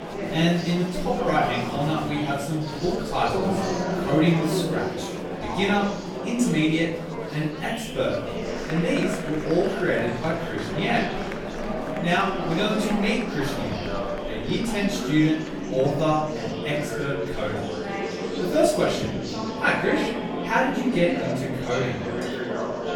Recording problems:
off-mic speech; far
room echo; noticeable; dies away in 0.6 s
murmuring crowd; loud; throughout; 5 dB below the speech
background music; noticeable; from 16 s on; 15 dB below the speech
clattering dishes; faint; at 22 s; peak 15 dB below the speech

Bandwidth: 18 kHz